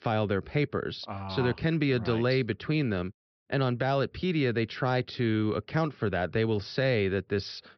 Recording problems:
high frequencies cut off; noticeable; nothing above 5.5 kHz

